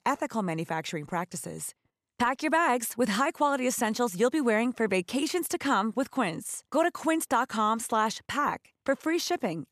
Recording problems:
none

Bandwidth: 14 kHz